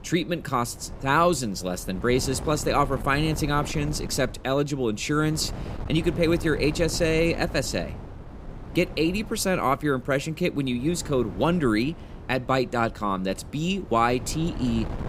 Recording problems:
wind noise on the microphone; occasional gusts; 15 dB below the speech

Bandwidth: 15.5 kHz